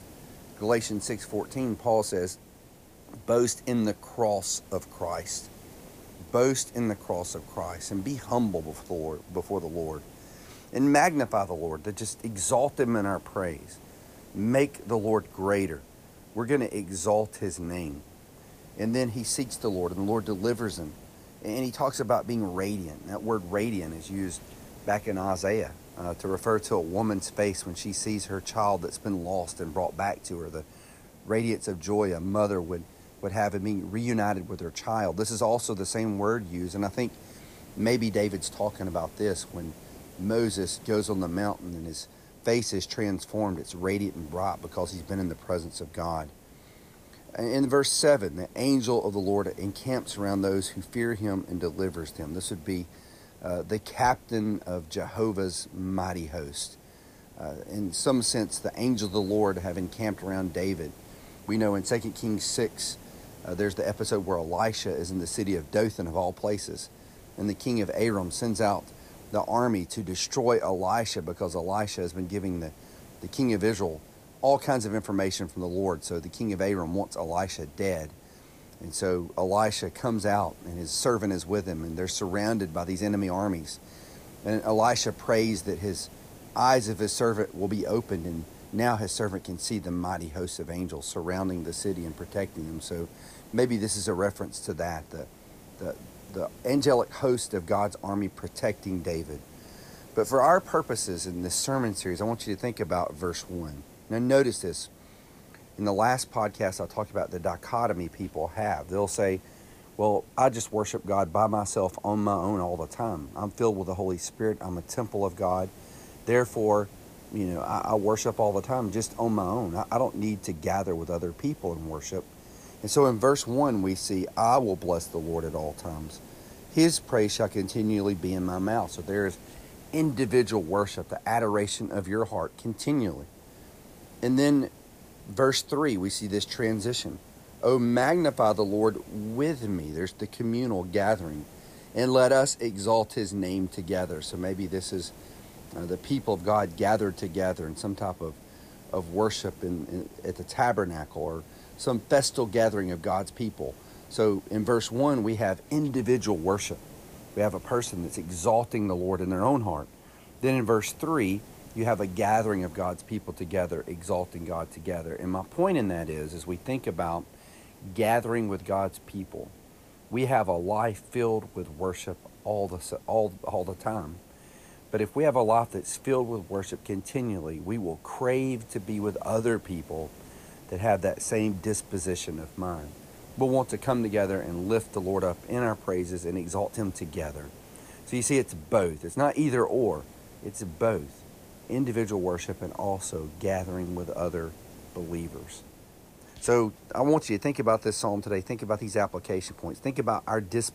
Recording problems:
hiss; faint; throughout; 20 dB below the speech

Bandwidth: 15 kHz